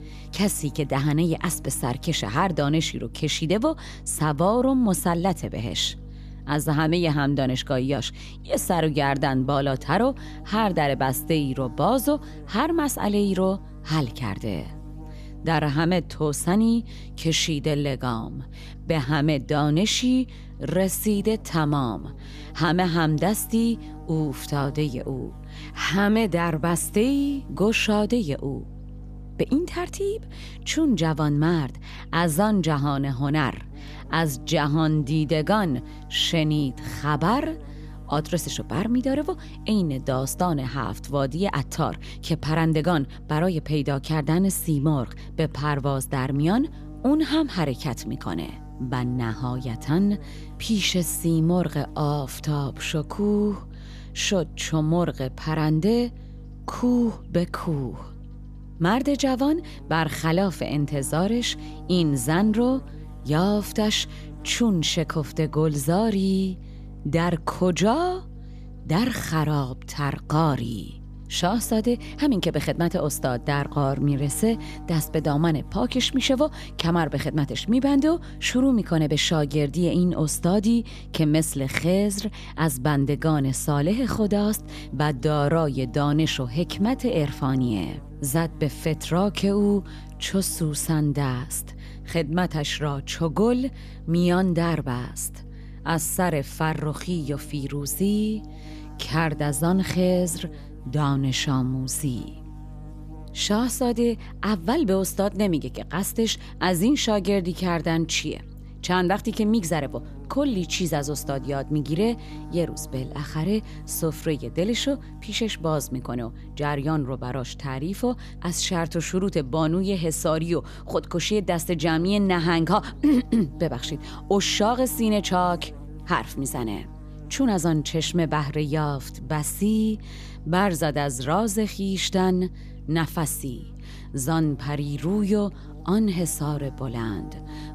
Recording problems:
electrical hum; faint; throughout; 50 Hz, 20 dB below the speech

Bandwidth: 14.5 kHz